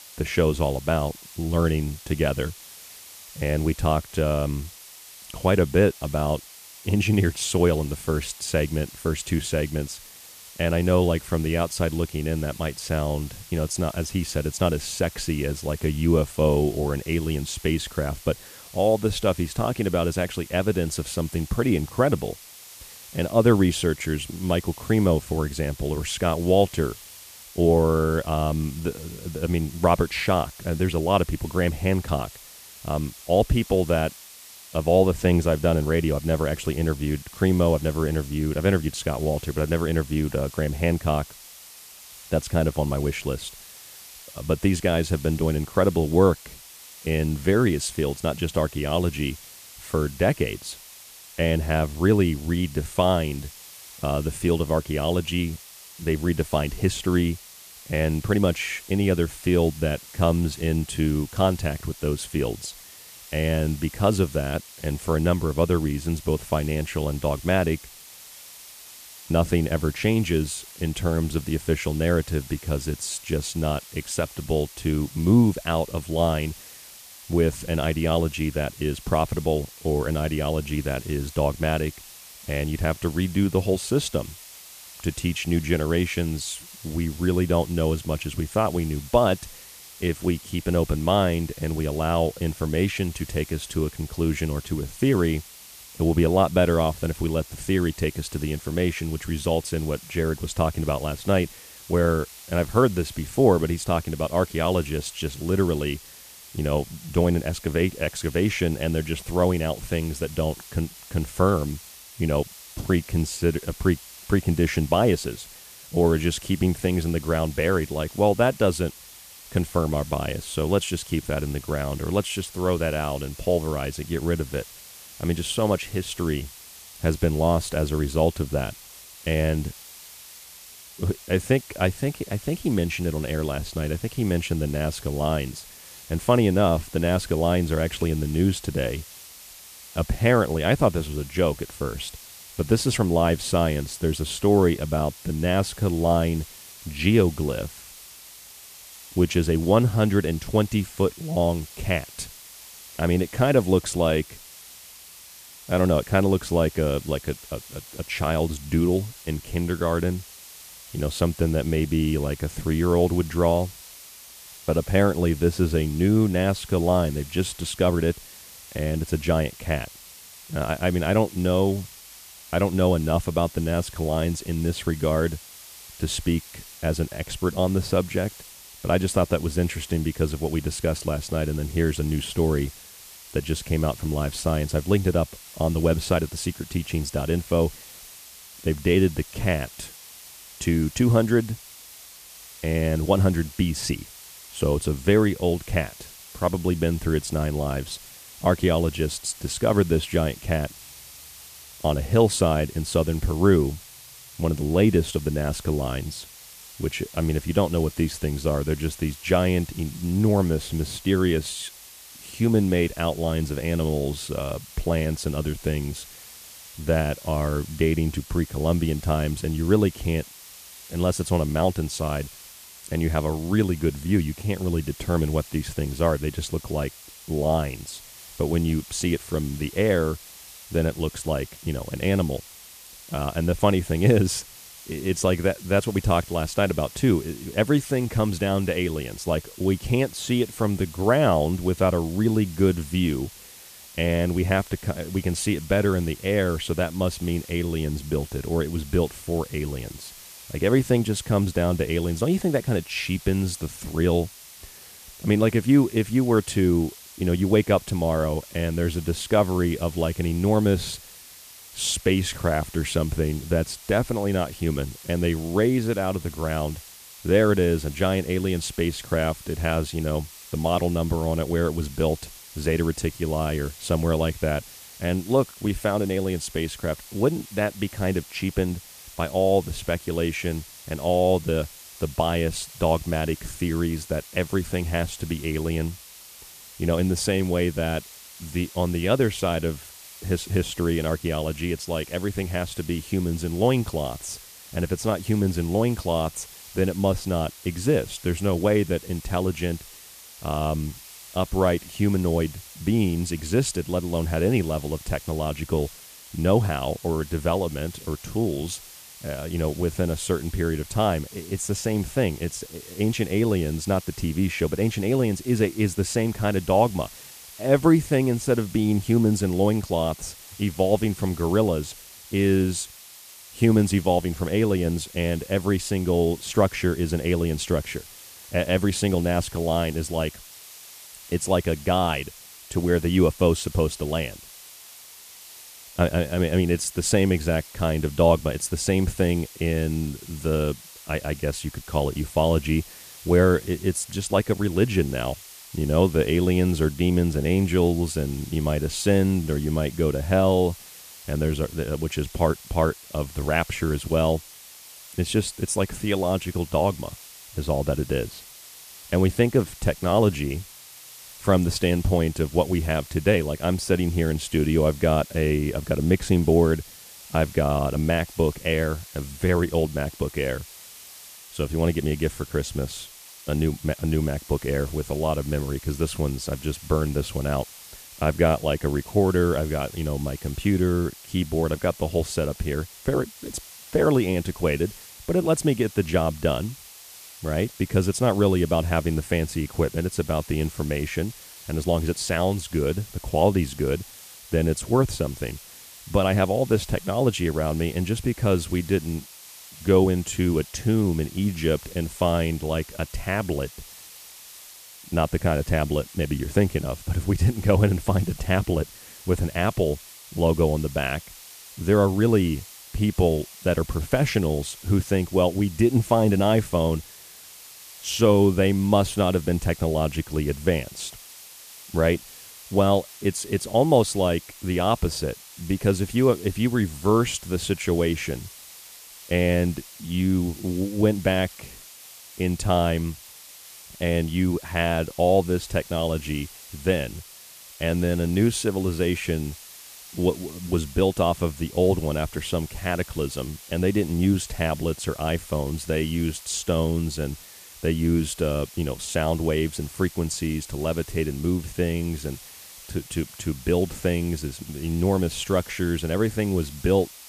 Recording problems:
hiss; noticeable; throughout; 15 dB below the speech

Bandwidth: 14.5 kHz